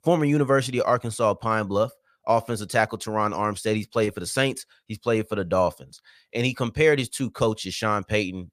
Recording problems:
none

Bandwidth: 15 kHz